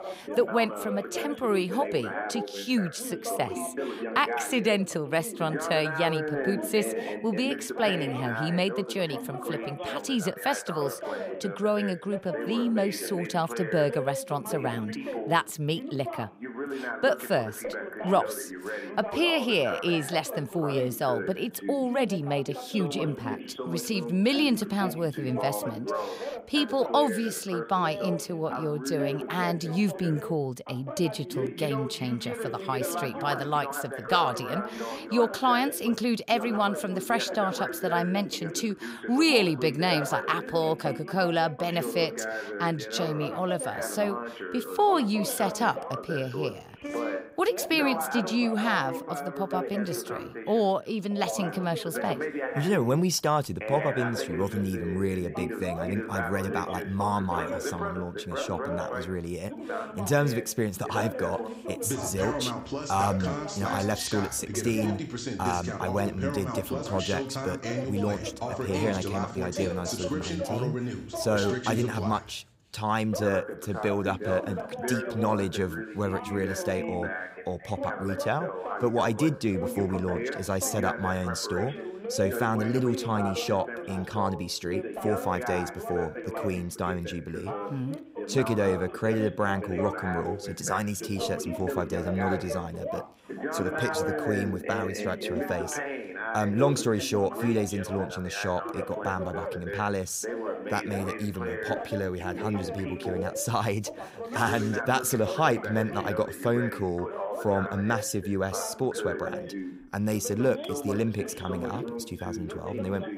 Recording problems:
background chatter; loud; throughout; 2 voices, 6 dB below the speech

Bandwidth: 15.5 kHz